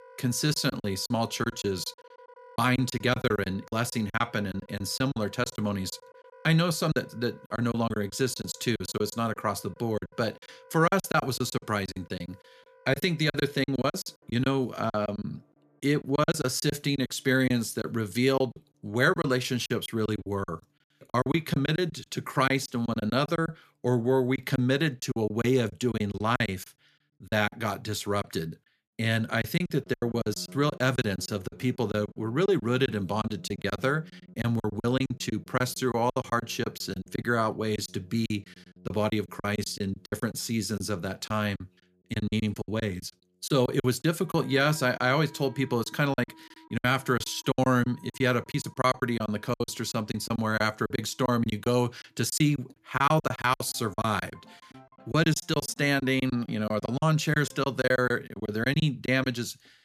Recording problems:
background music; faint; throughout; 25 dB below the speech
choppy; very; 14% of the speech affected

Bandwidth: 14.5 kHz